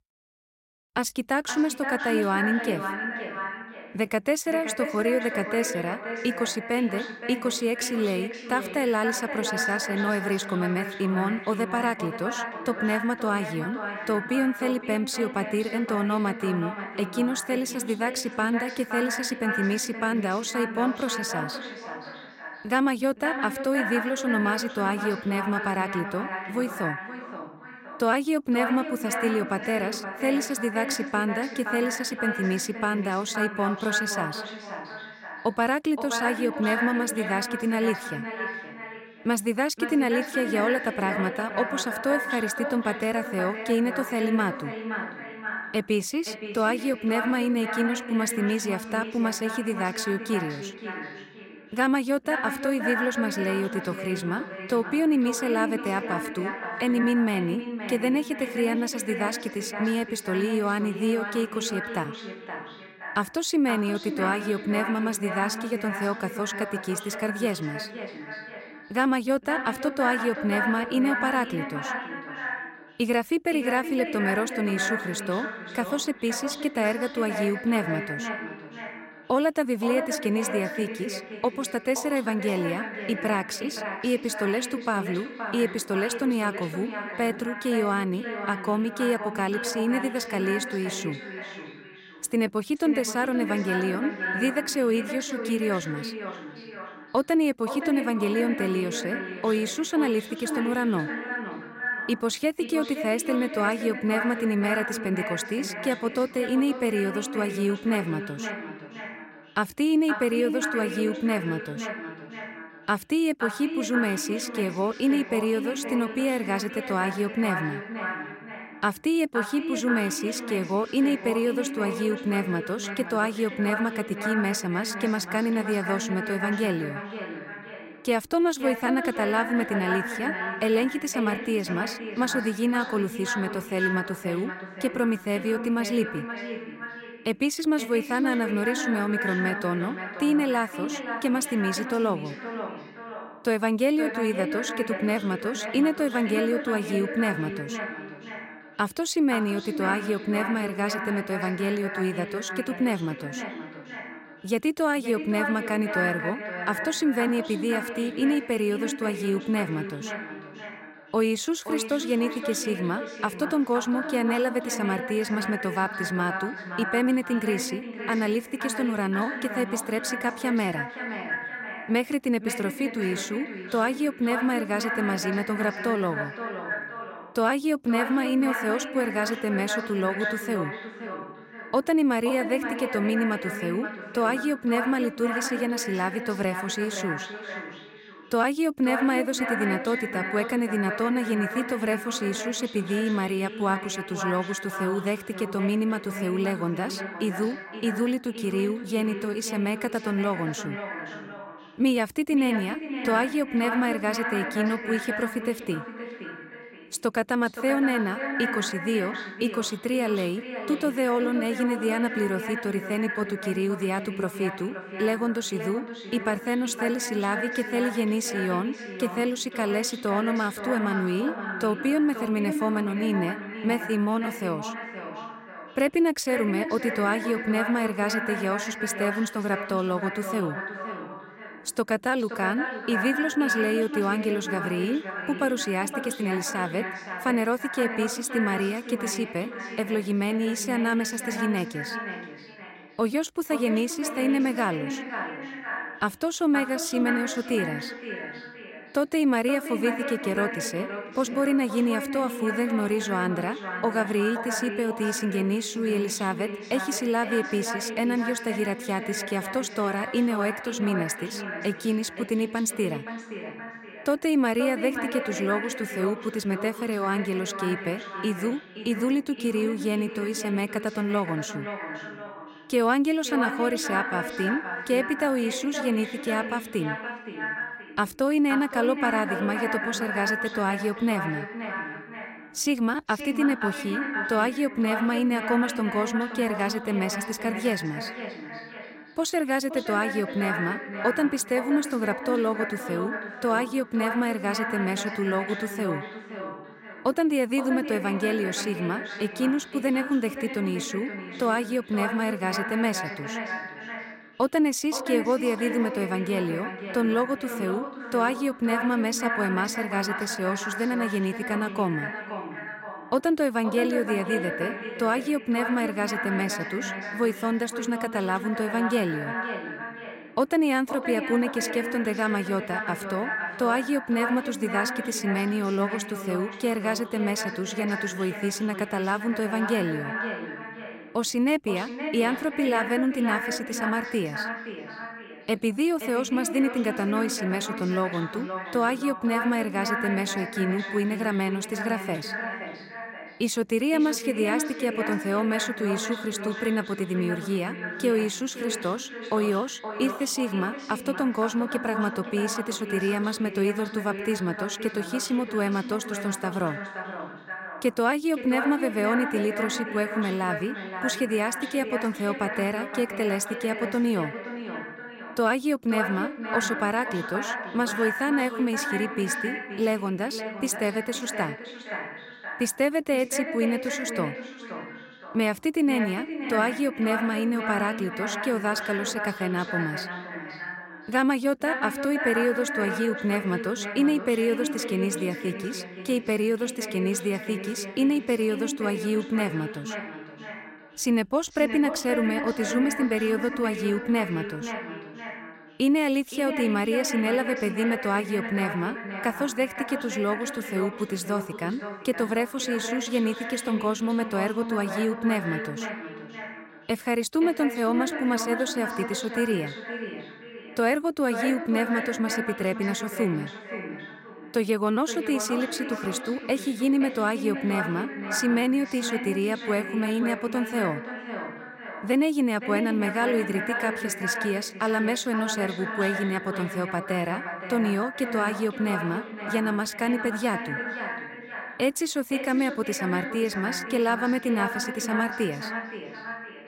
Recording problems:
echo of what is said; strong; throughout; 520 ms later, 6 dB below the speech

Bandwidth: 16 kHz